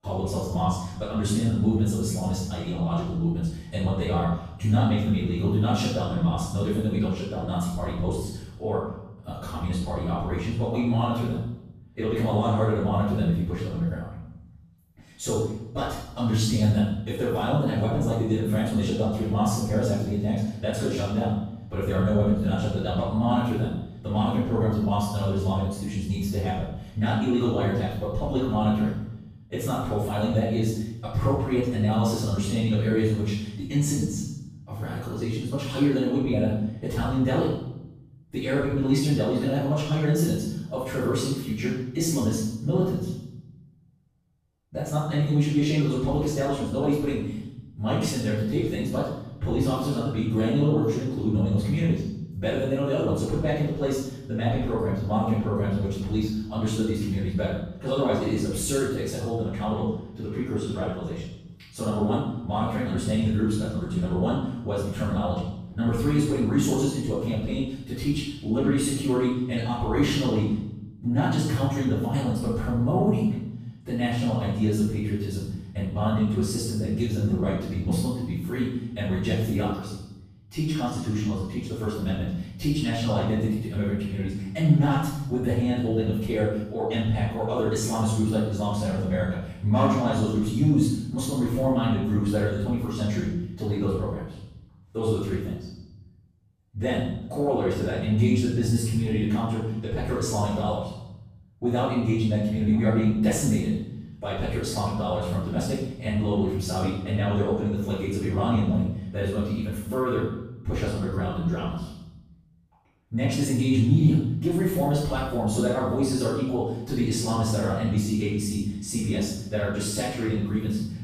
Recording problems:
room echo; strong; dies away in 0.8 s
off-mic speech; far
wrong speed, natural pitch; too fast; 1.5 times normal speed

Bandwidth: 15 kHz